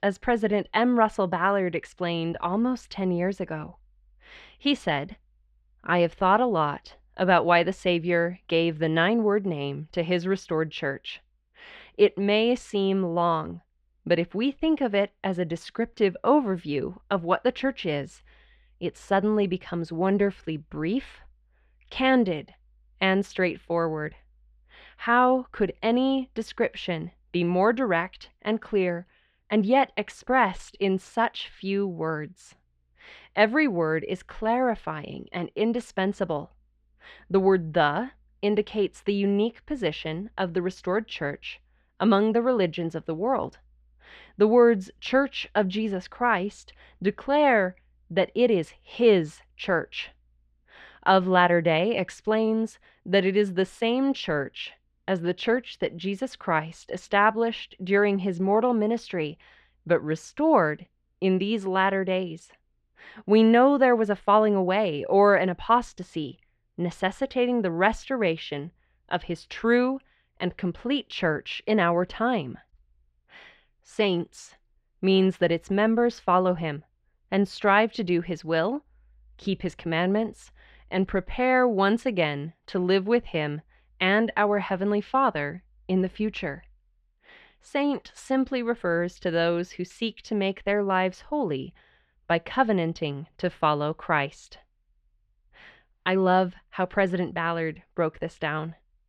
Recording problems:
muffled; slightly; fading above 3 kHz

